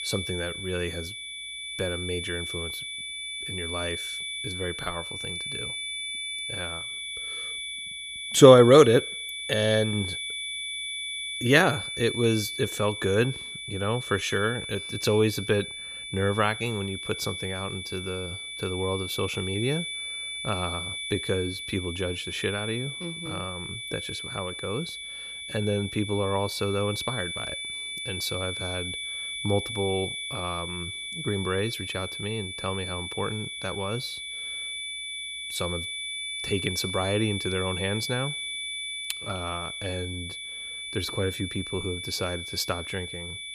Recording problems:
high-pitched whine; loud; throughout; 3.5 kHz, 5 dB below the speech

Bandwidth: 15 kHz